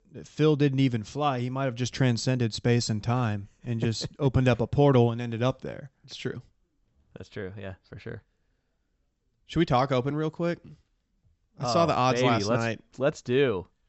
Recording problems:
high frequencies cut off; noticeable; nothing above 8 kHz

